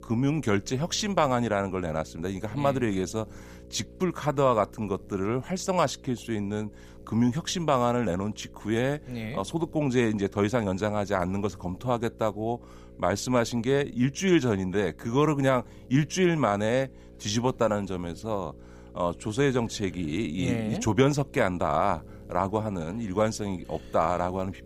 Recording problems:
electrical hum; faint; throughout; 60 Hz, 25 dB below the speech

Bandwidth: 15.5 kHz